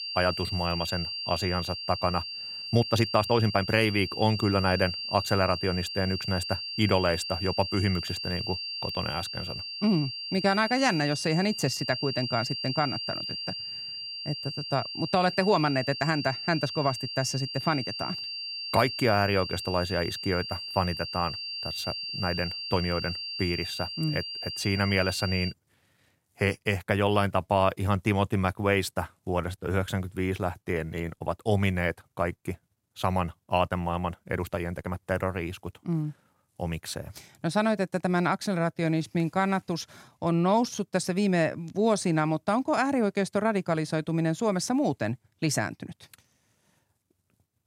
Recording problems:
high-pitched whine; loud; until 26 s; 4.5 kHz, 5 dB below the speech
uneven, jittery; strongly; from 2.5 to 41 s

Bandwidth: 16 kHz